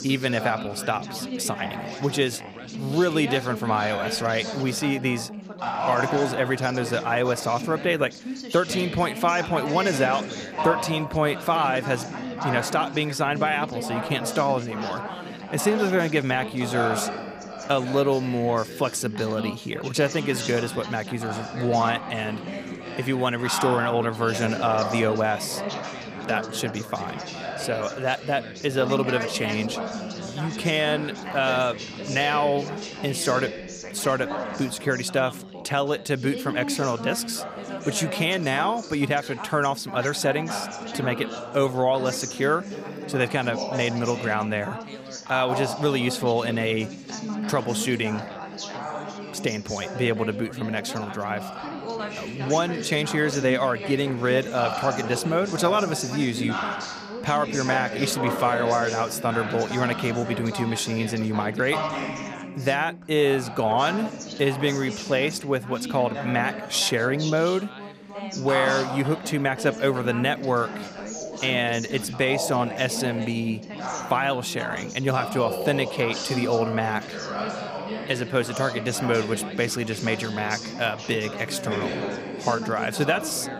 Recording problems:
background chatter; loud; throughout; 4 voices, 7 dB below the speech

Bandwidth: 15 kHz